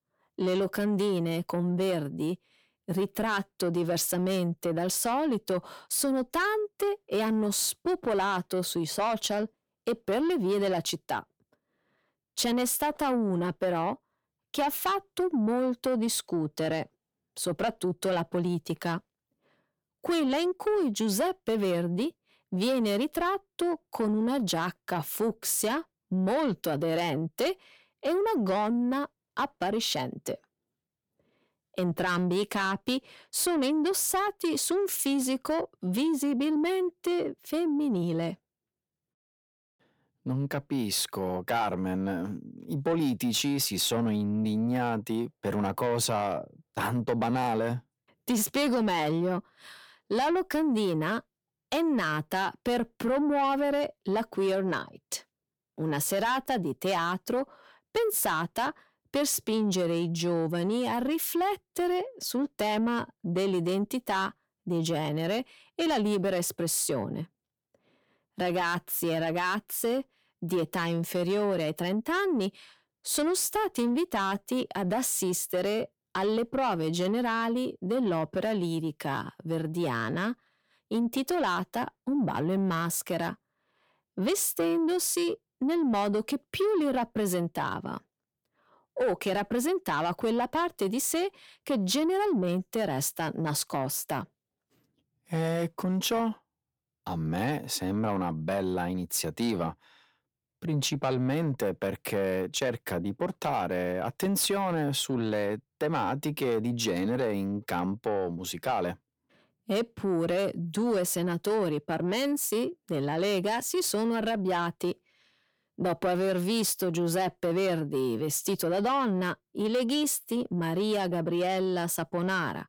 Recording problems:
distortion; slight; 10 dB below the speech

